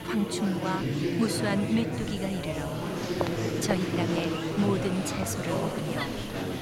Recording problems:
murmuring crowd; very loud; throughout; as loud as the speech
hiss; noticeable; throughout; 15 dB below the speech

